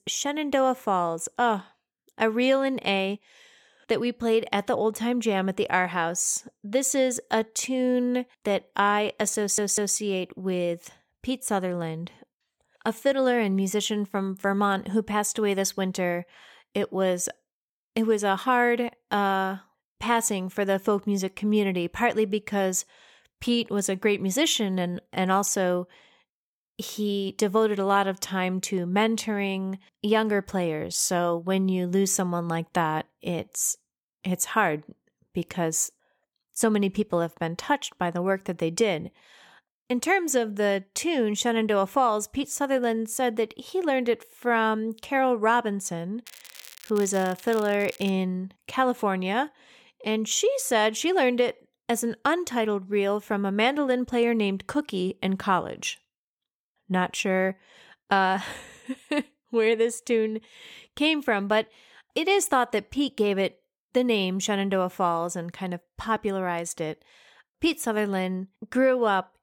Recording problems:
crackling; noticeable; from 46 to 48 s; 20 dB below the speech
audio stuttering; at 9.5 s

